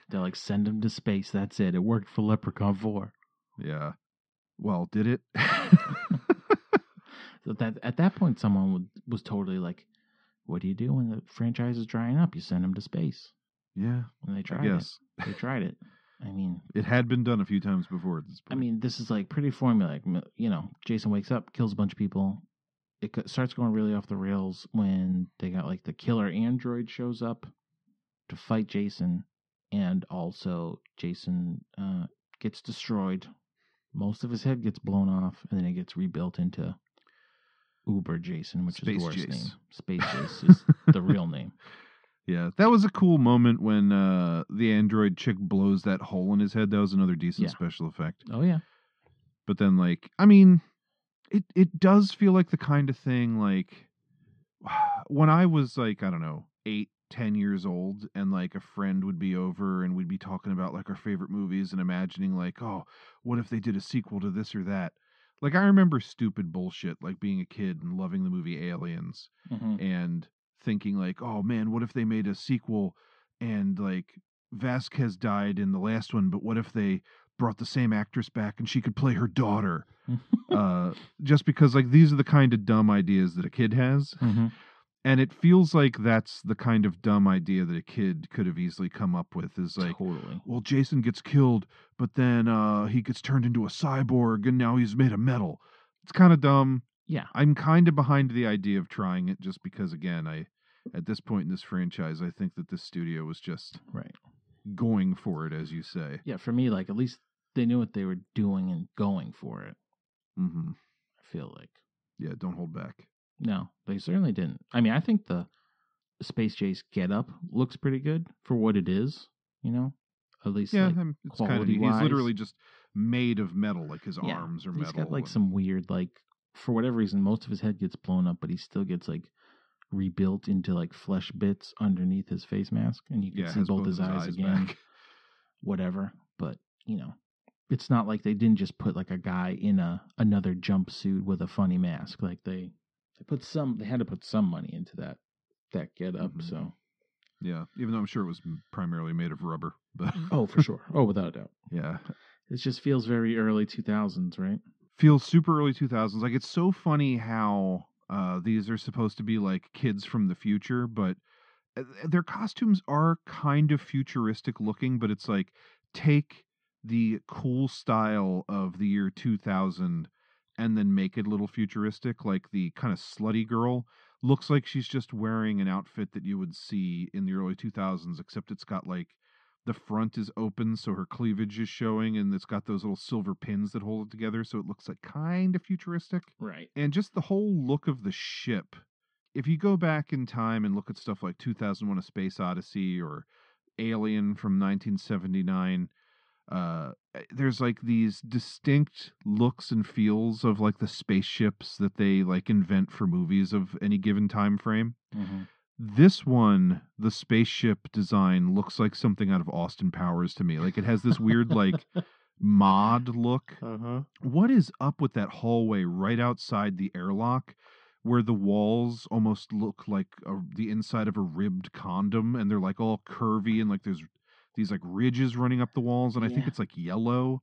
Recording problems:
muffled; slightly; fading above 4 kHz

